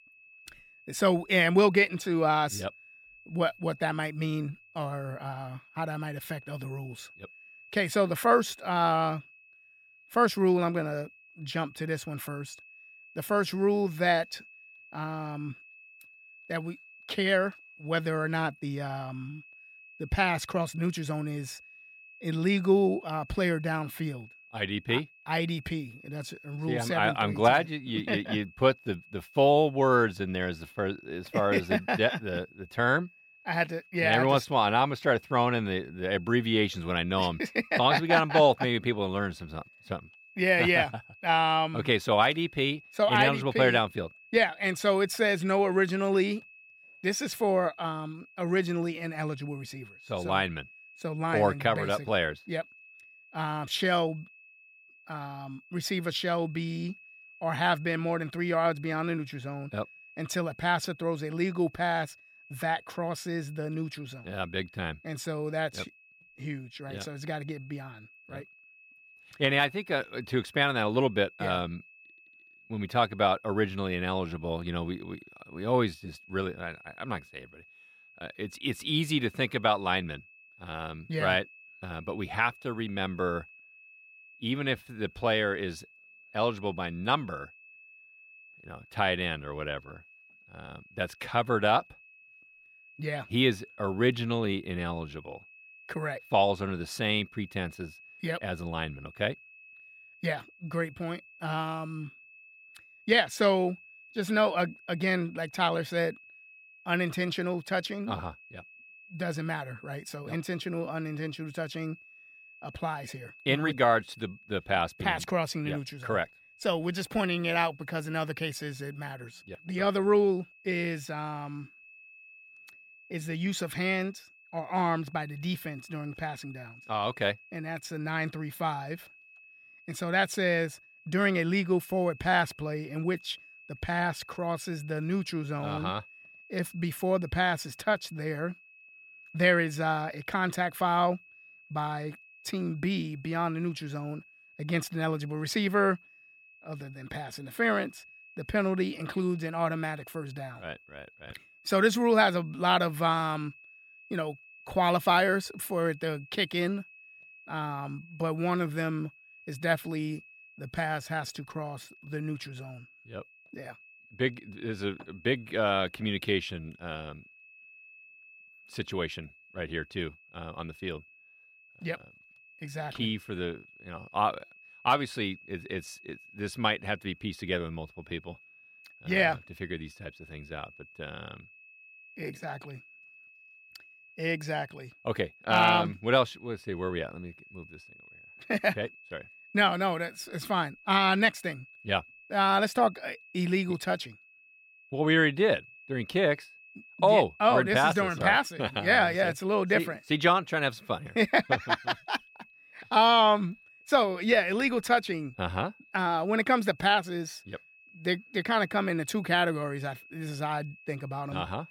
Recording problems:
high-pitched whine; faint; throughout; 2.5 kHz, 25 dB below the speech

